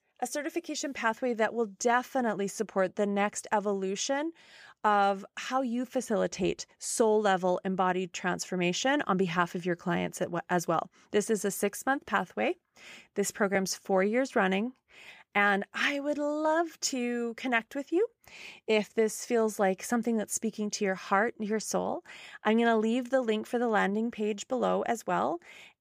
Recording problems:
none

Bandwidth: 15 kHz